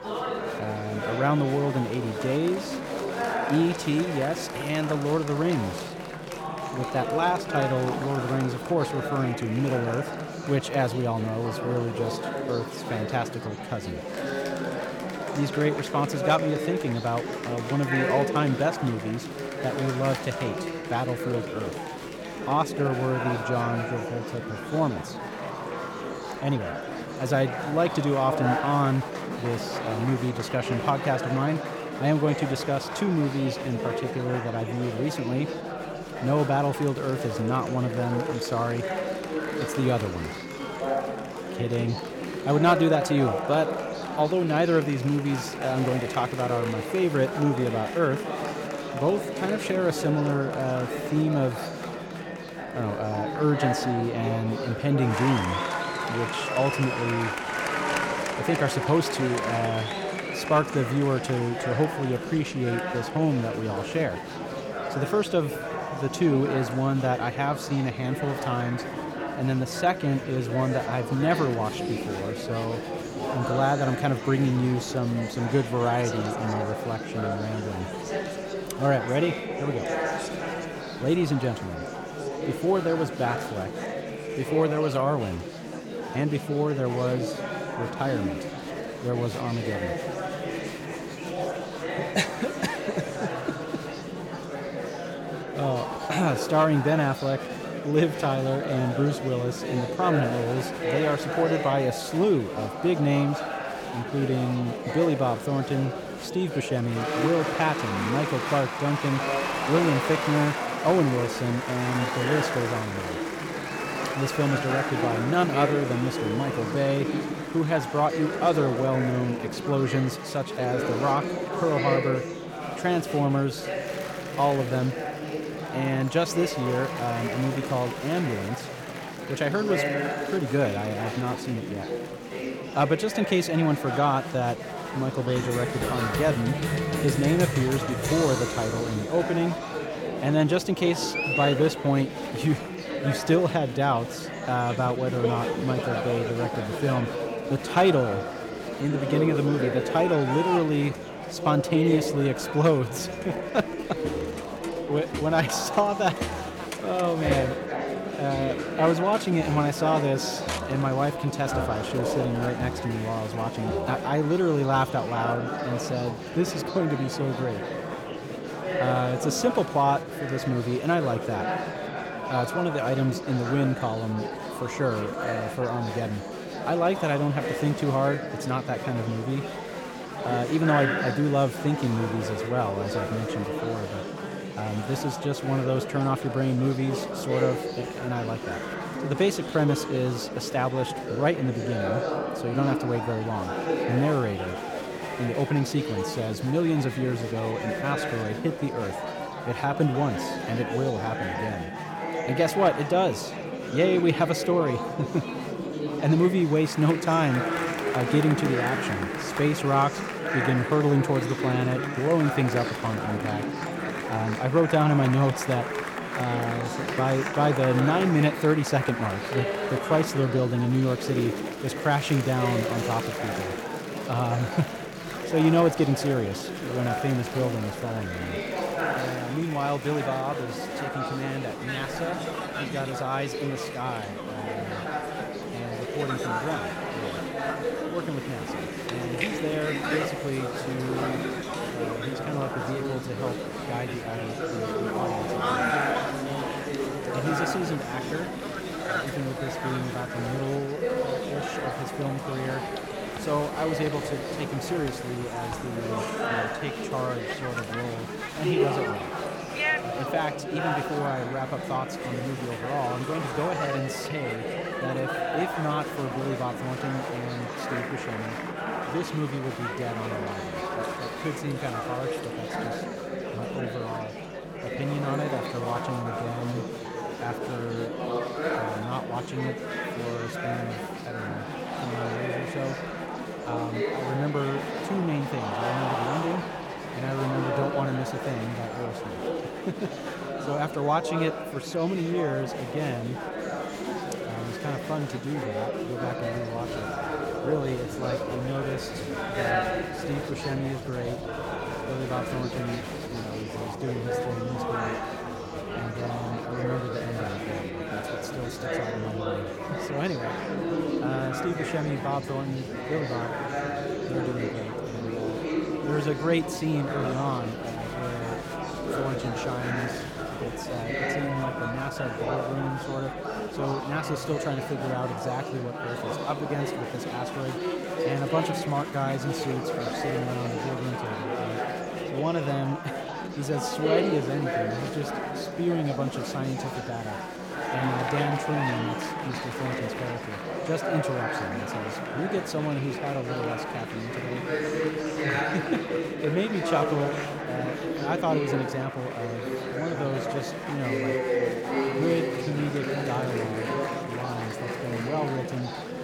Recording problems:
murmuring crowd; loud; throughout; 3 dB below the speech

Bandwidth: 17 kHz